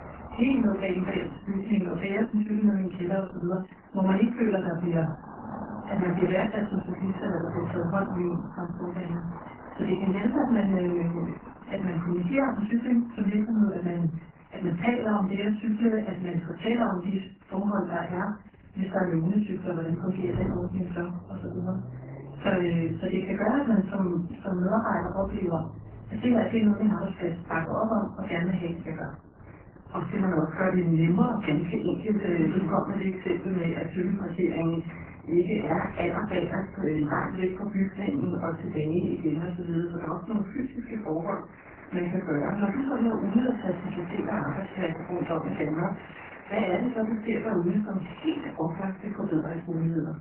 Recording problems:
off-mic speech; far
garbled, watery; badly; nothing above 3 kHz
room echo; slight; dies away in 0.3 s
traffic noise; noticeable; throughout; 15 dB below the speech

